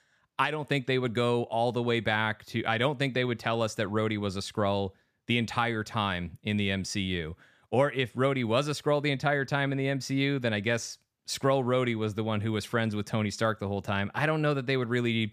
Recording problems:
none

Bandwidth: 14.5 kHz